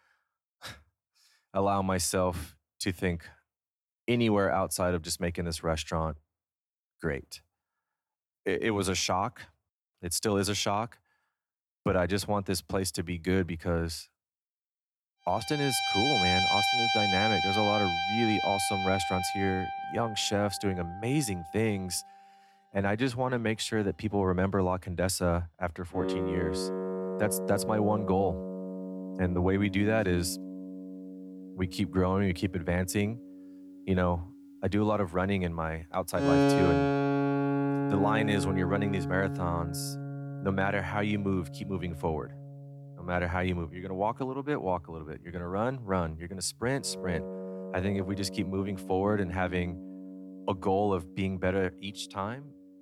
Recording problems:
background music; loud; from 16 s on; 1 dB below the speech

